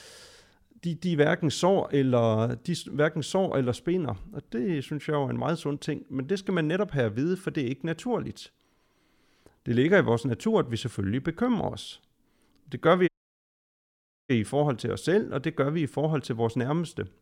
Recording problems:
audio cutting out; at 13 s for 1 s

